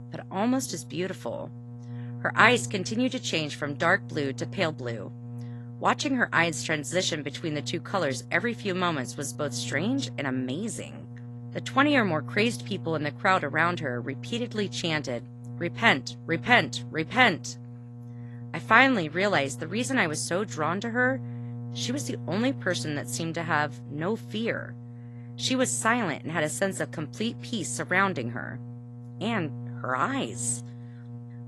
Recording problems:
garbled, watery; slightly; nothing above 11.5 kHz
electrical hum; faint; throughout; 60 Hz, 25 dB below the speech

